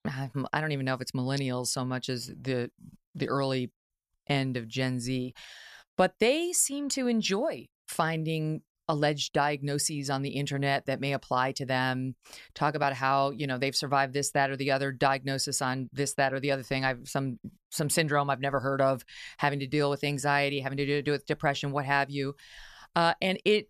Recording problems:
none

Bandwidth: 14 kHz